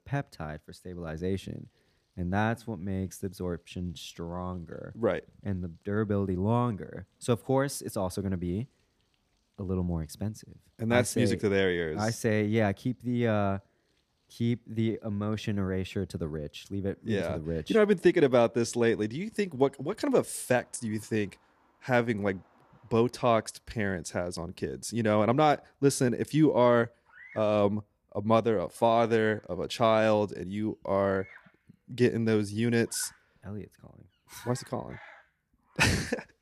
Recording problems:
animal sounds; faint; throughout; 25 dB below the speech

